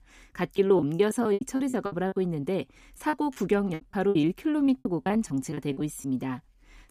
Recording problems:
choppy; very; 17% of the speech affected

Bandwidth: 15 kHz